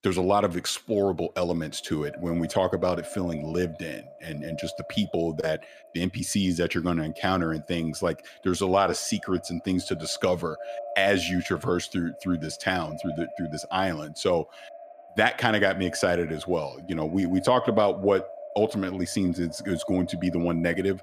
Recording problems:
echo of what is said; noticeable; throughout; 570 ms later, 15 dB below the speech

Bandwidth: 14.5 kHz